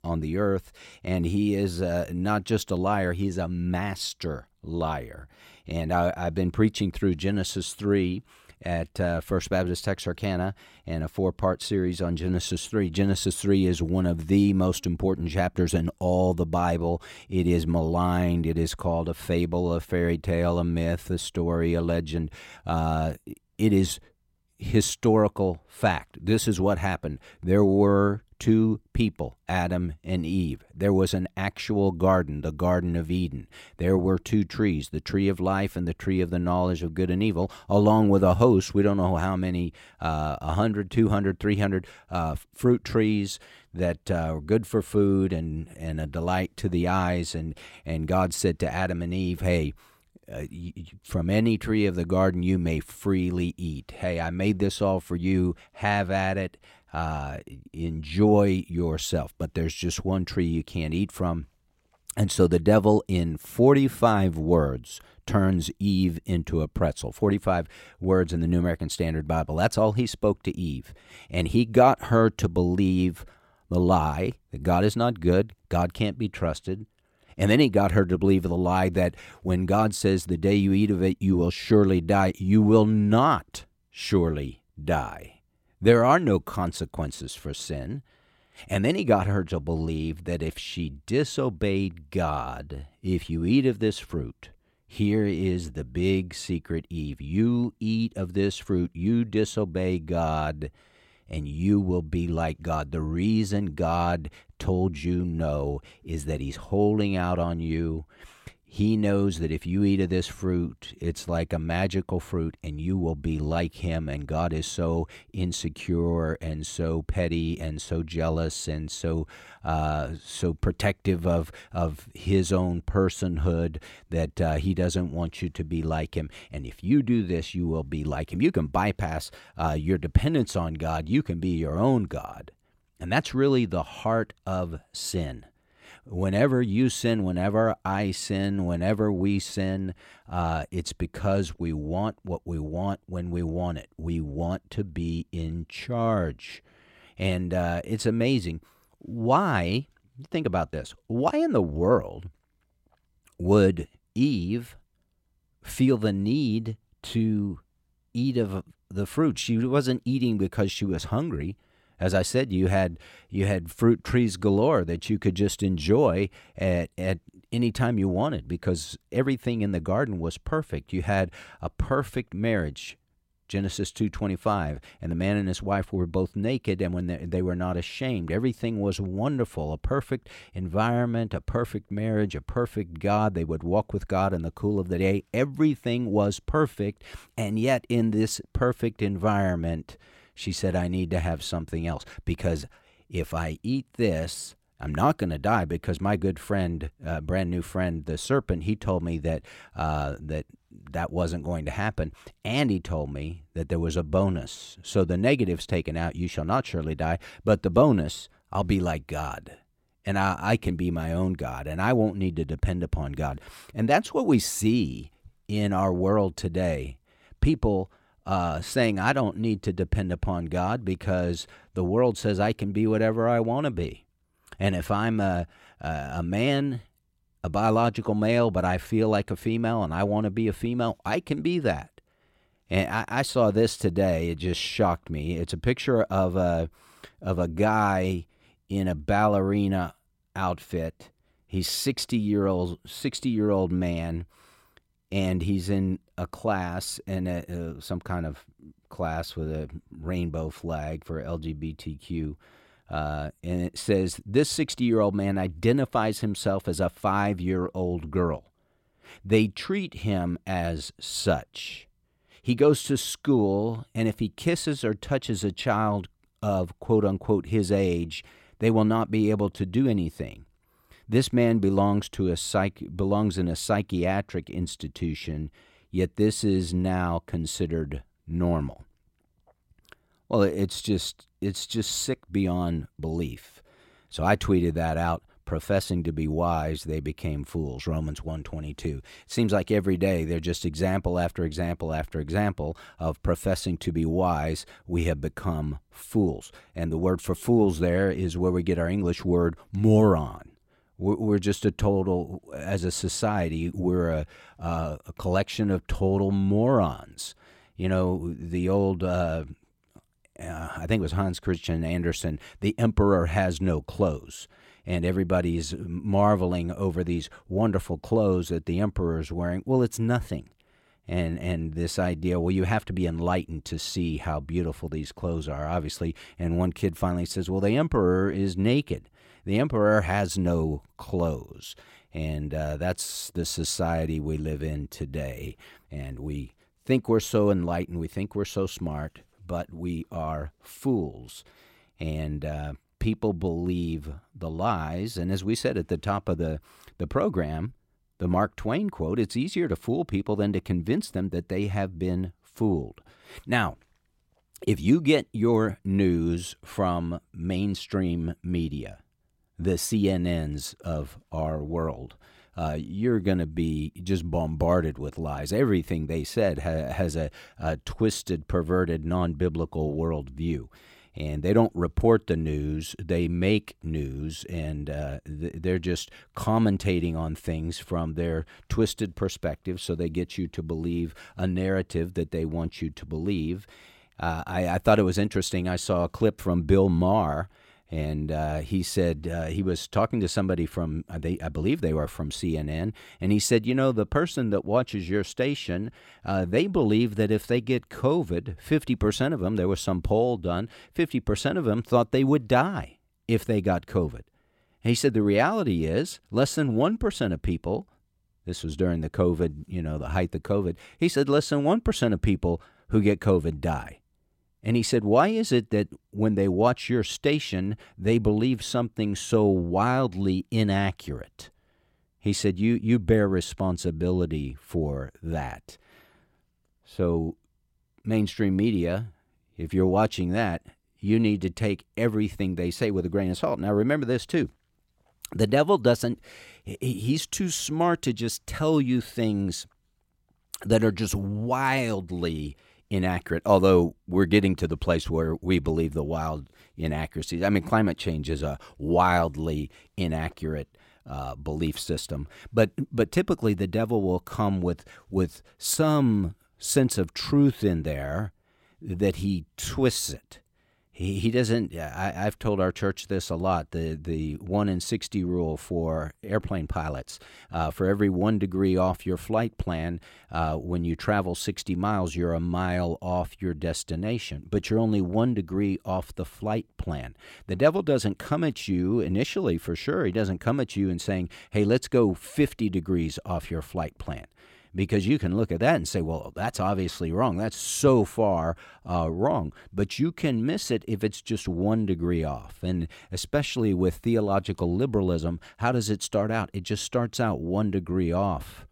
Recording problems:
none

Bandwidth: 16.5 kHz